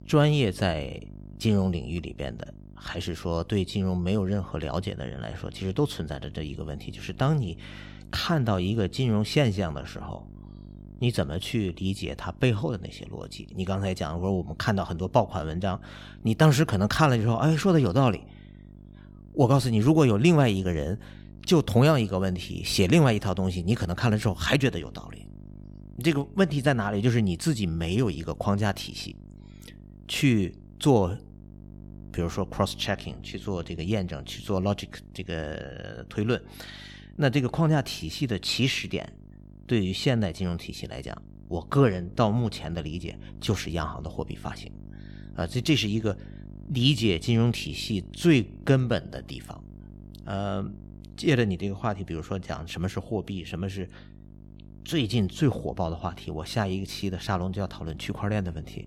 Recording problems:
electrical hum; faint; throughout; 50 Hz, 25 dB below the speech

